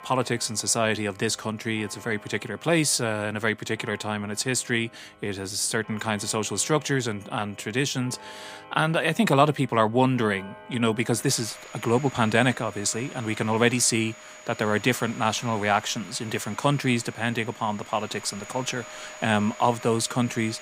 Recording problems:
household noises; noticeable; throughout; 20 dB below the speech

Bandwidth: 15.5 kHz